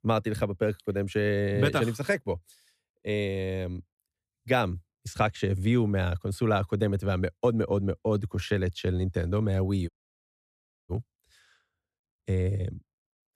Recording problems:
audio cutting out; at 10 s for 1 s

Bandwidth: 14.5 kHz